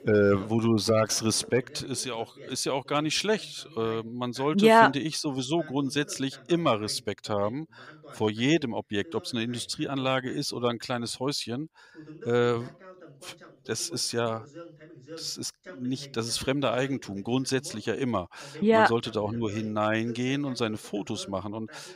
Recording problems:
voice in the background; faint; throughout; 20 dB below the speech

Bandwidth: 15.5 kHz